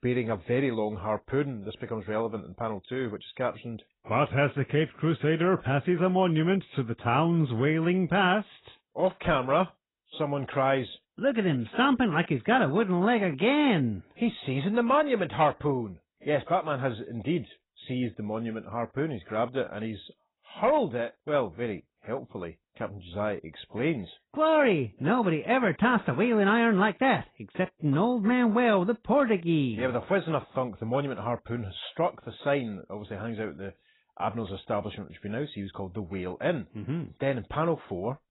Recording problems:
garbled, watery; badly; nothing above 4 kHz

